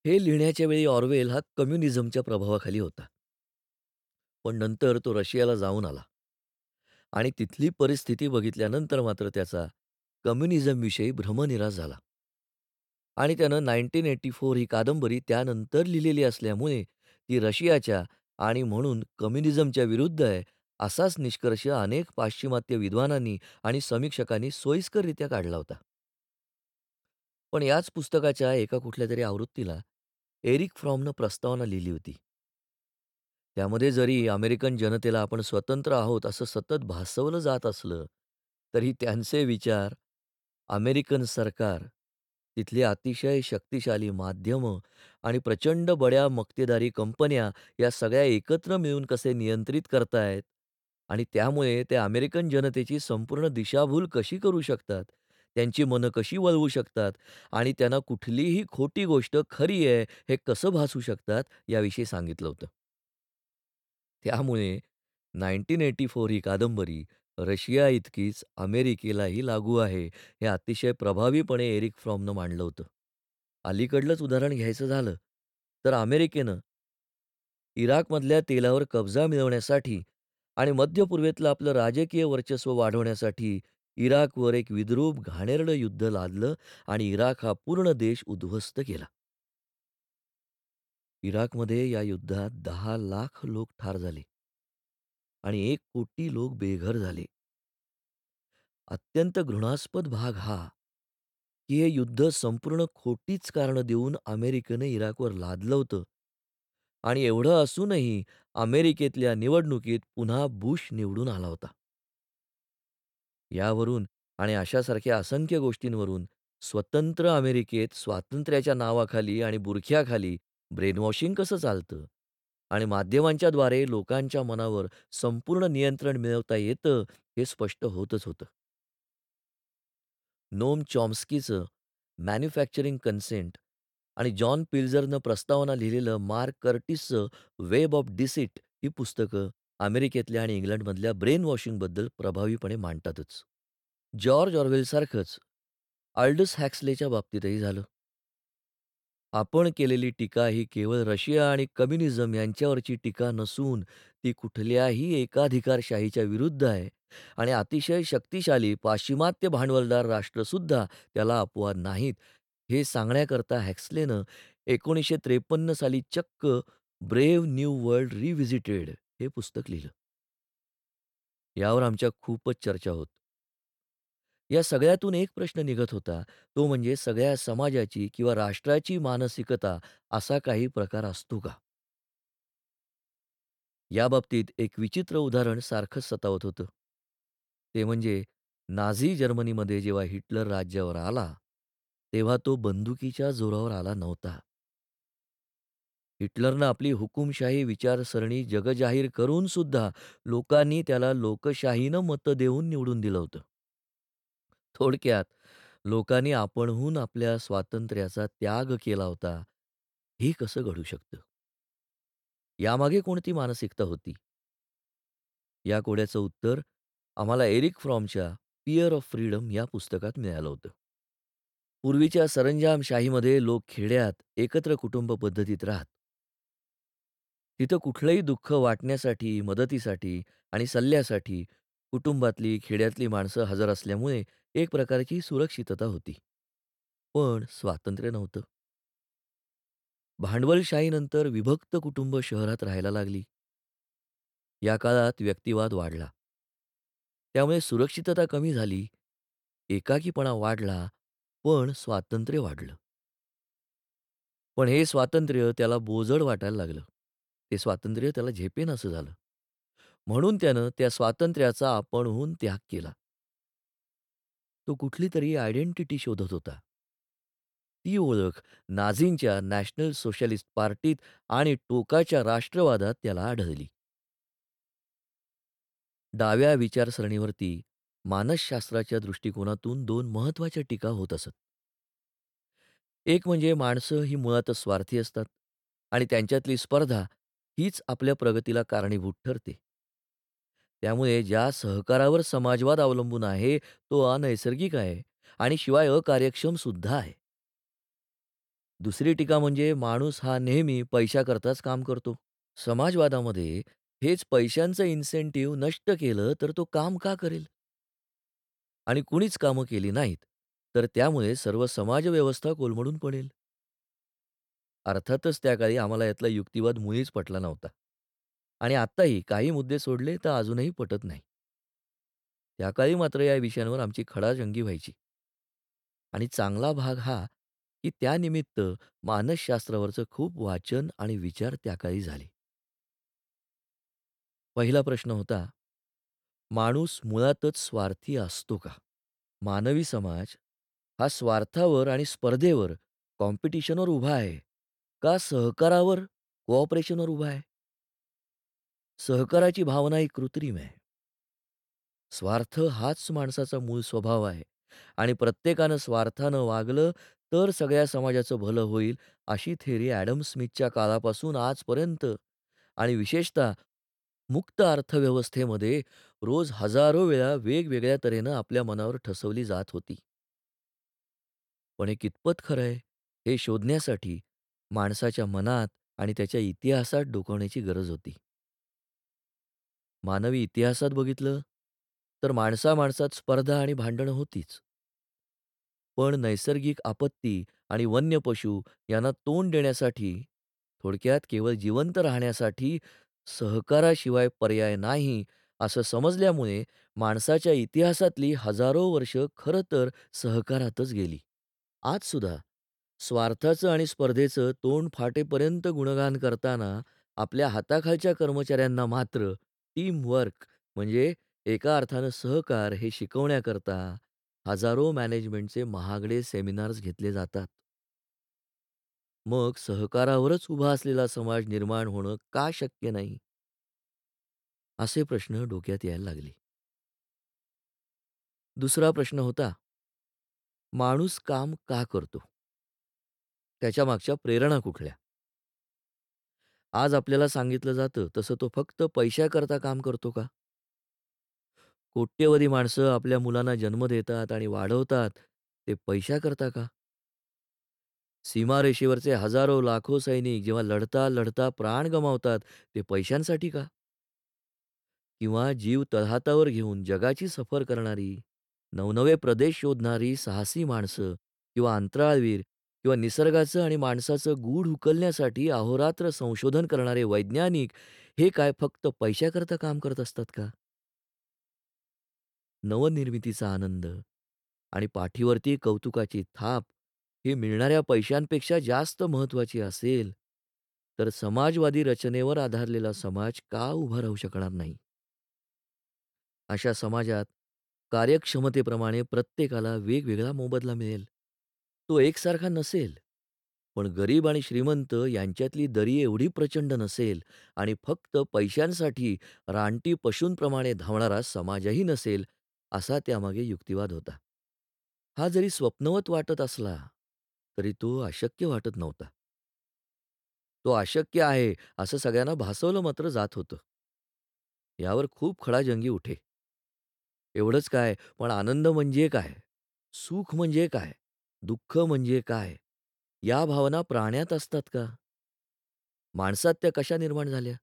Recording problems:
none

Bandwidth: 18 kHz